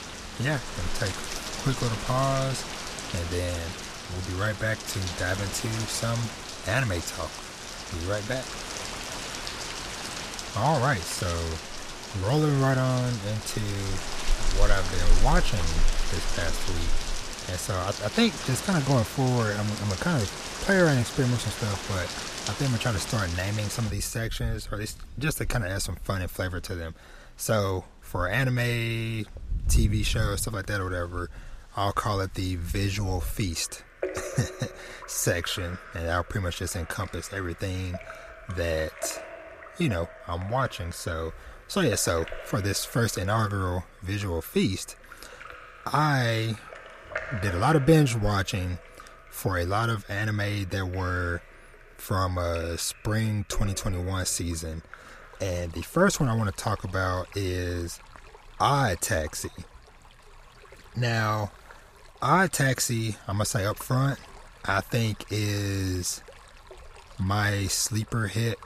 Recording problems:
rain or running water; loud; throughout; 7 dB below the speech

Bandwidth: 14.5 kHz